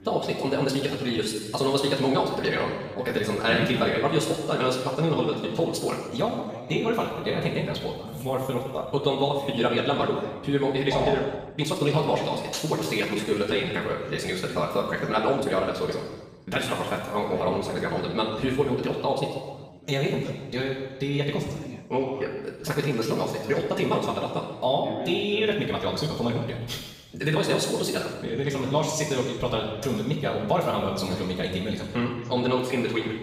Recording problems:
off-mic speech; far
wrong speed, natural pitch; too fast; 1.7 times normal speed
room echo; noticeable; dies away in 1.2 s
voice in the background; noticeable; throughout; 15 dB below the speech
uneven, jittery; strongly; from 0.5 to 33 s

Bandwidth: 15 kHz